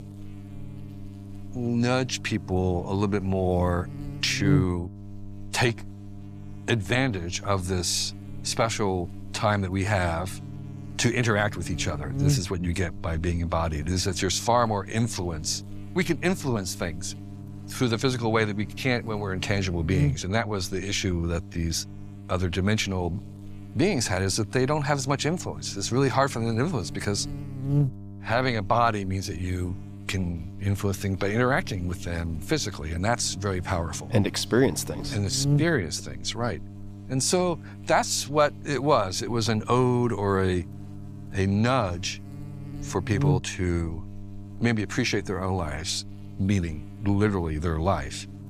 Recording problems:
electrical hum; noticeable; throughout; 50 Hz, 15 dB below the speech

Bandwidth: 15 kHz